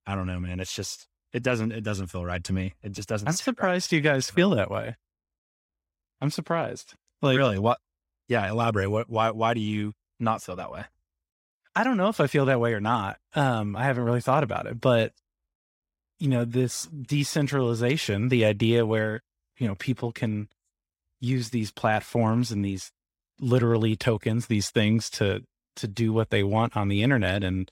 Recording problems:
none

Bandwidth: 16 kHz